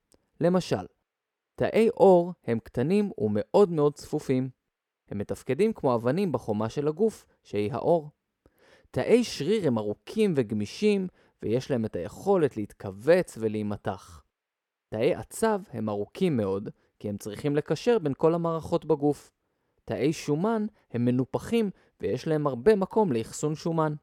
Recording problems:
muffled; slightly; fading above 2.5 kHz

